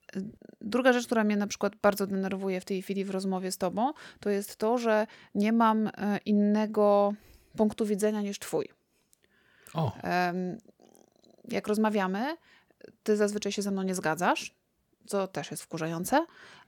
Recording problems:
none

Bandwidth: 18.5 kHz